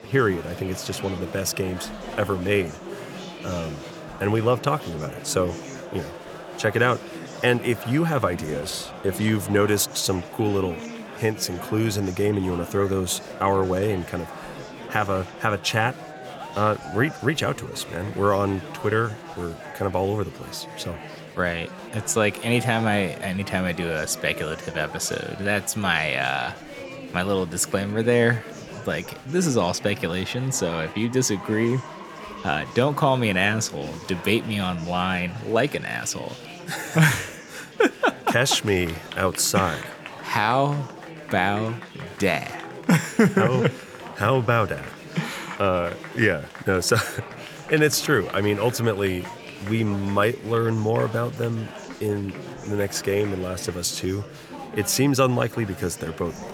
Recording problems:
chatter from many people; noticeable; throughout; 15 dB below the speech

